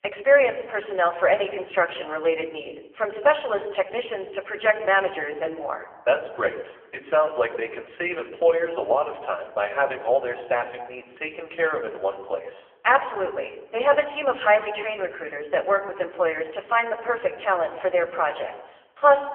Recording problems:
phone-call audio; poor line; nothing above 3 kHz
room echo; slight; dies away in 0.9 s
off-mic speech; somewhat distant

